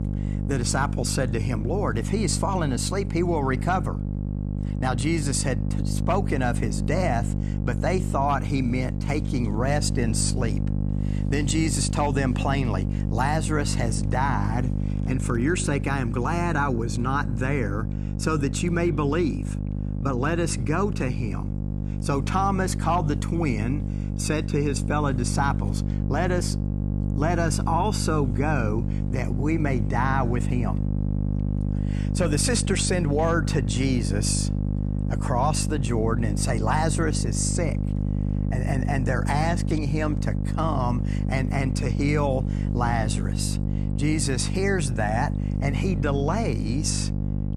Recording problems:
electrical hum; loud; throughout; 50 Hz, 10 dB below the speech

